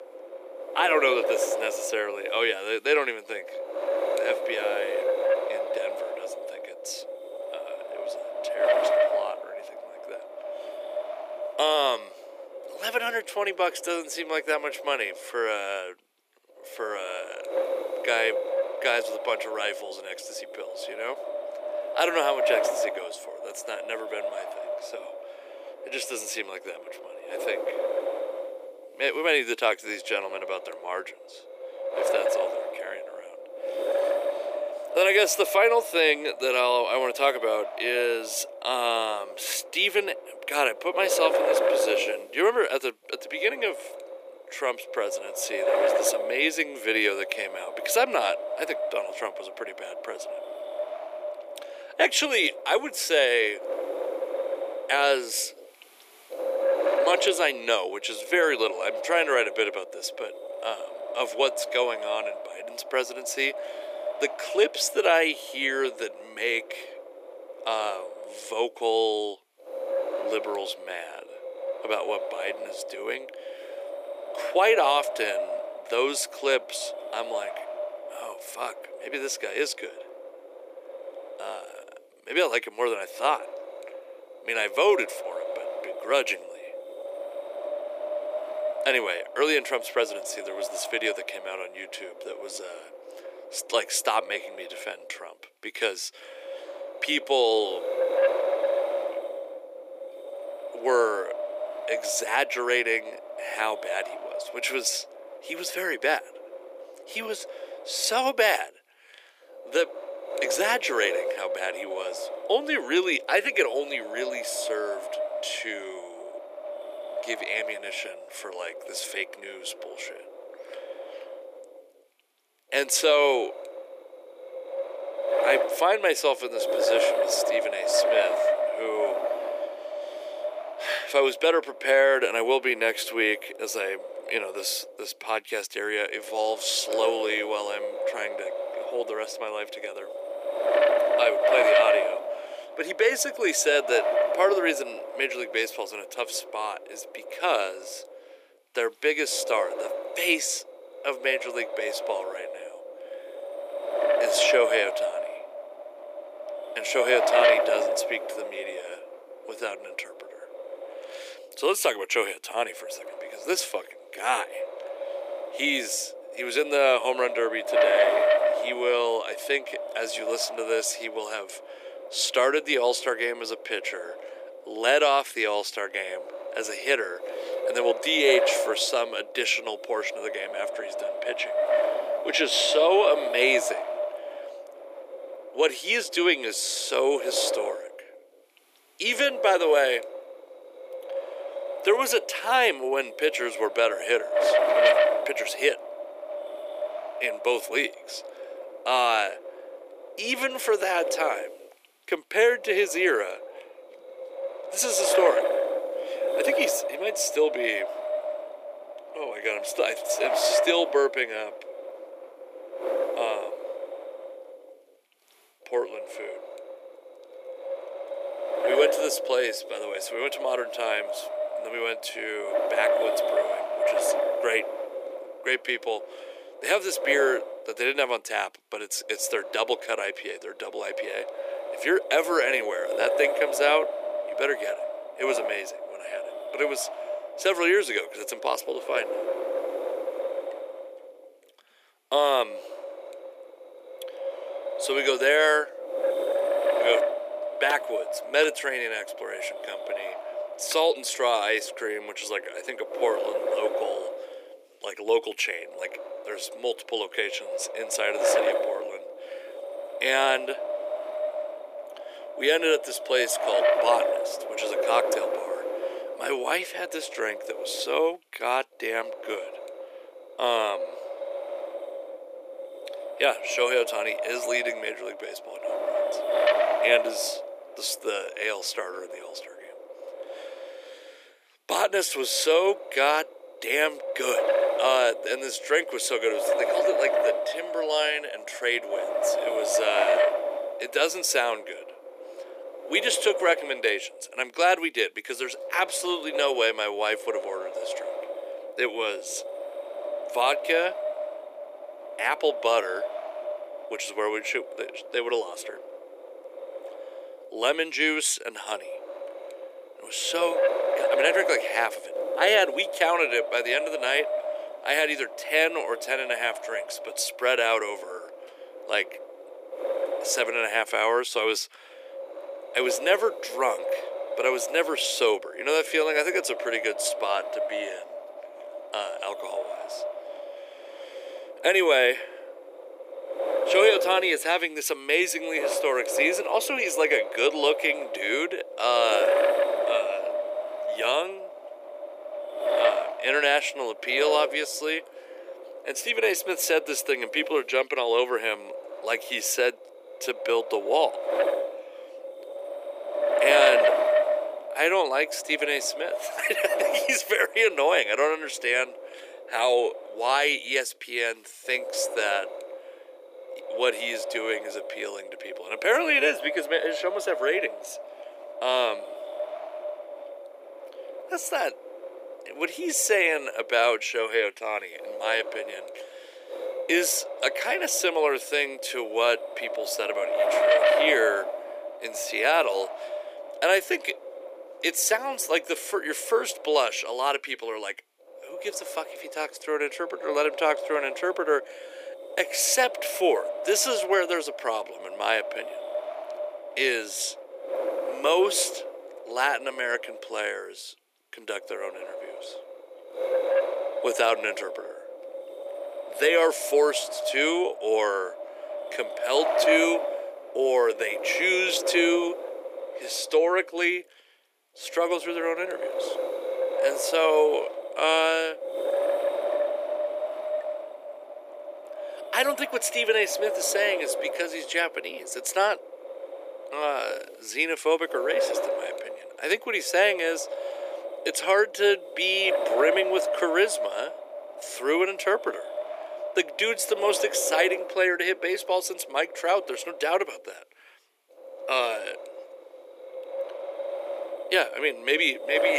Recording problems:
thin; very; fading below 350 Hz
wind noise on the microphone; heavy; 4 dB below the speech
abrupt cut into speech; at the end

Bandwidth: 15 kHz